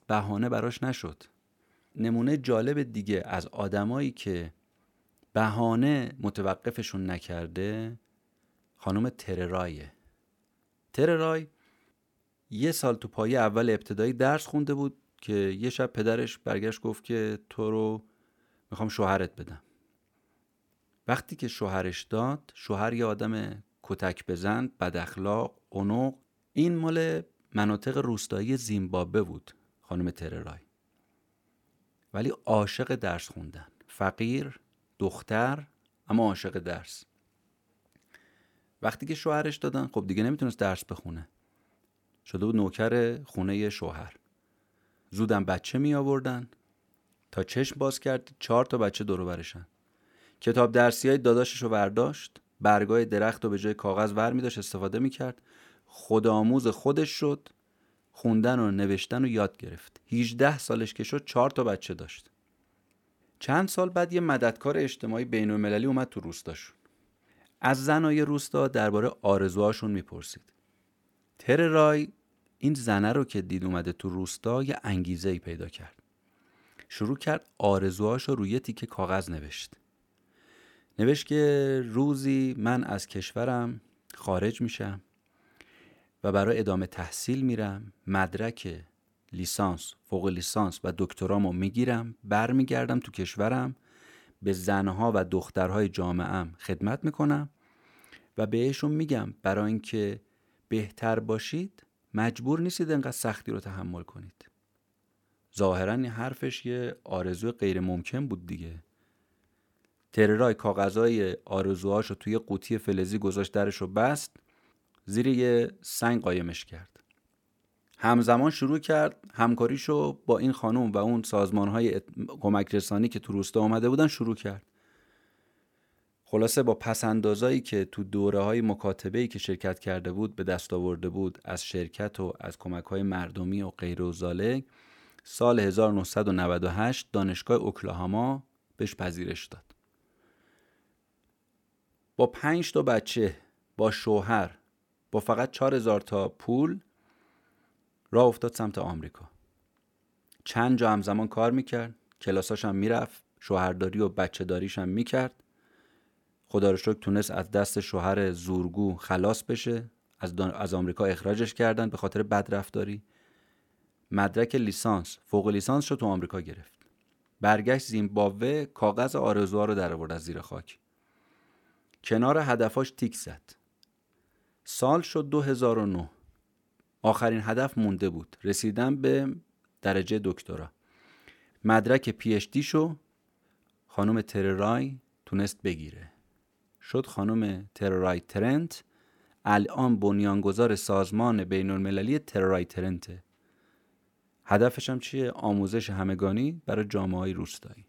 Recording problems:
none

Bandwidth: 17.5 kHz